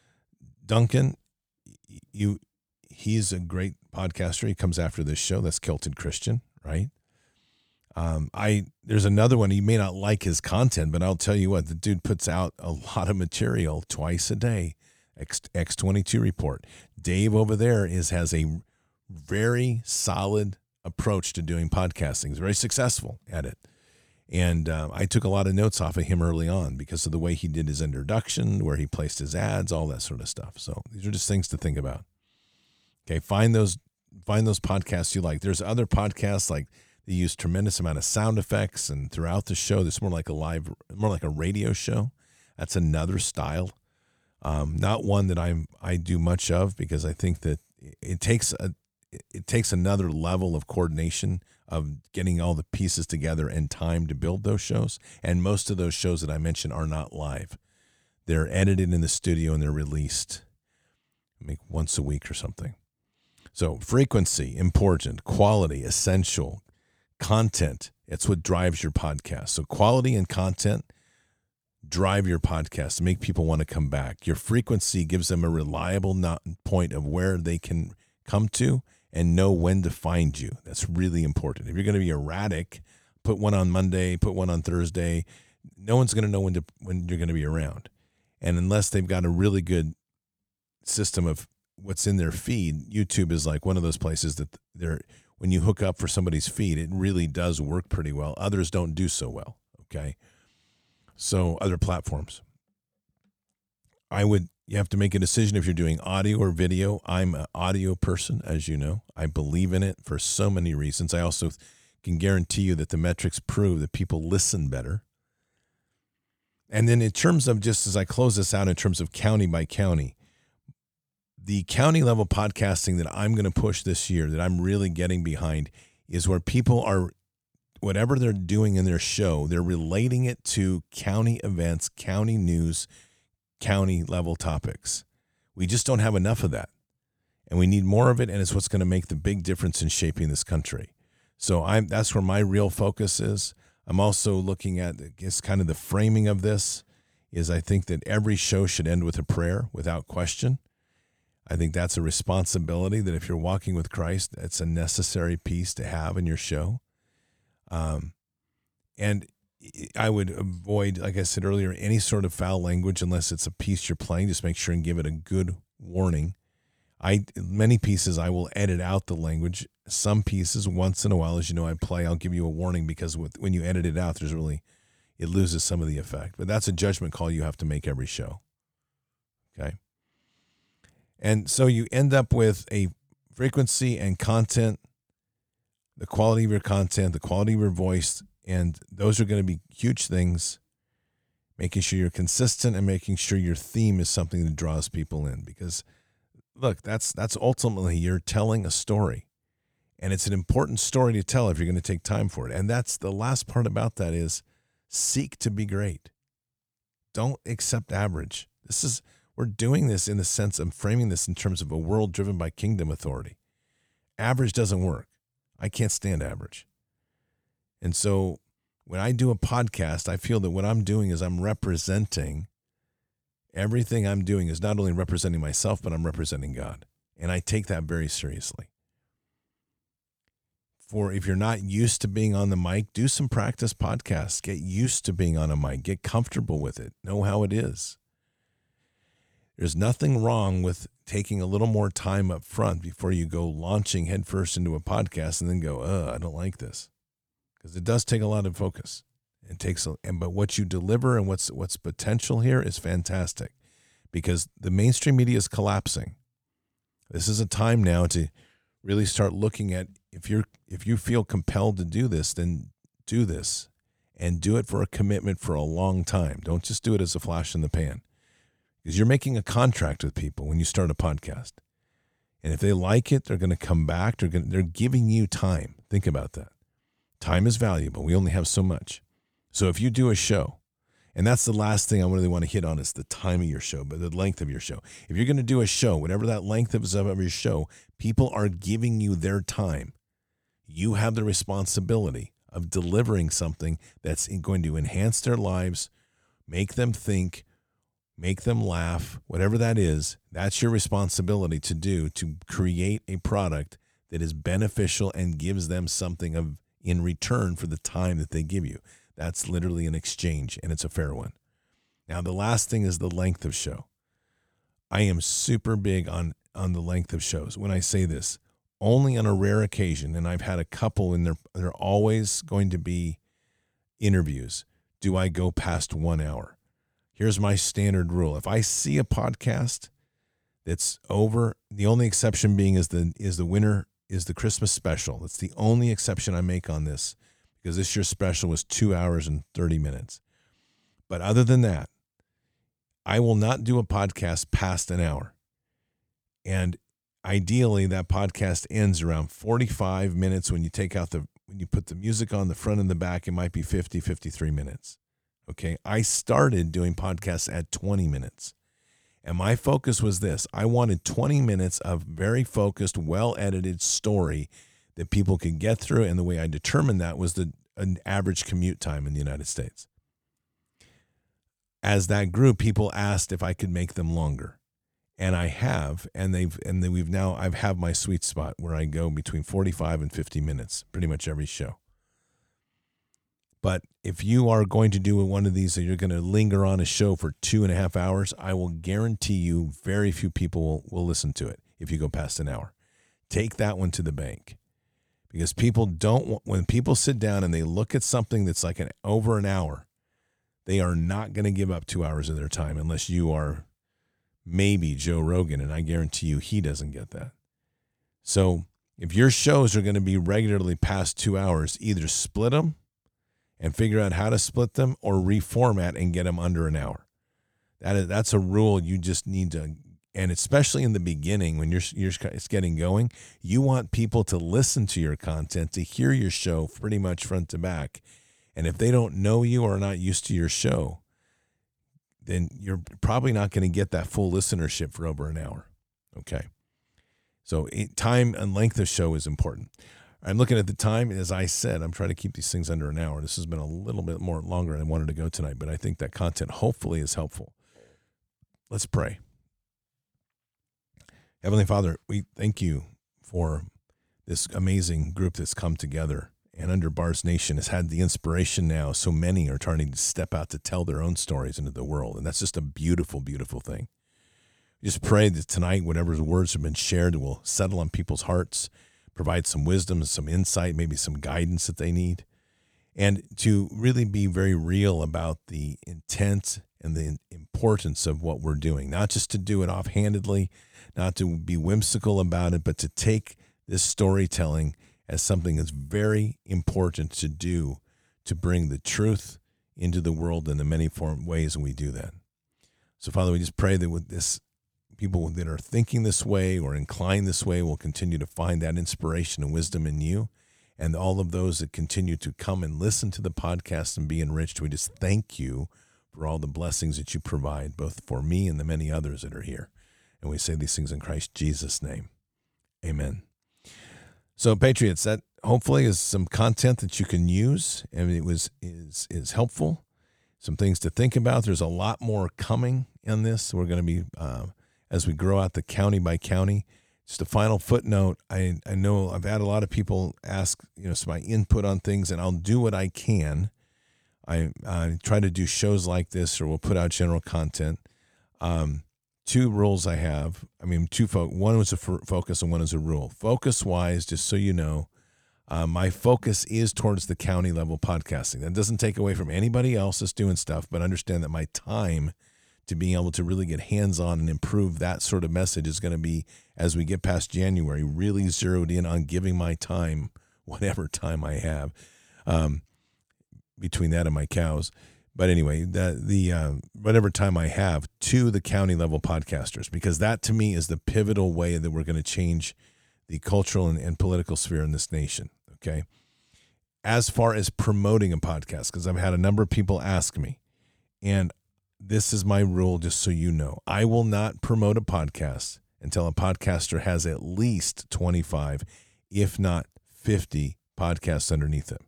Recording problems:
none

